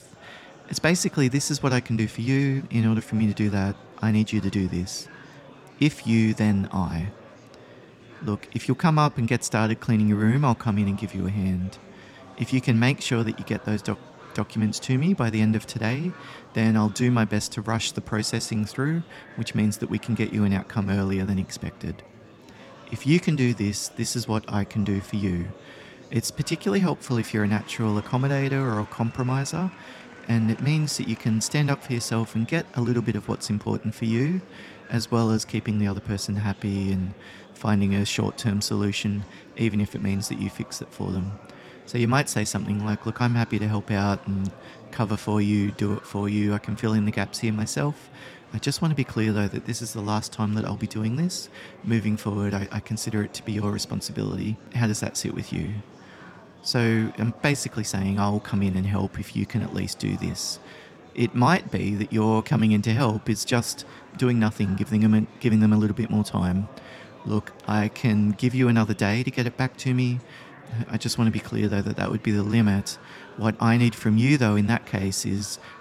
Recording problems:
murmuring crowd; faint; throughout; 20 dB below the speech

